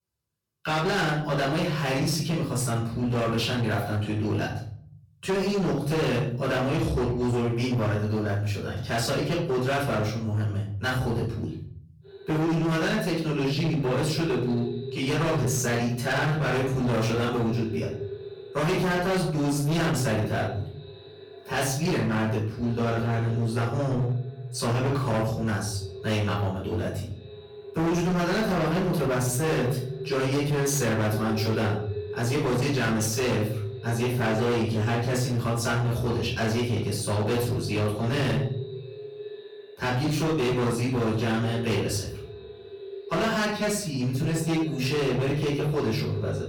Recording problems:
distortion; heavy; 23% of the sound clipped
off-mic speech; far
echo of what is said; noticeable; from 12 s on; 320 ms later, 15 dB below the speech
room echo; noticeable; dies away in 0.9 s

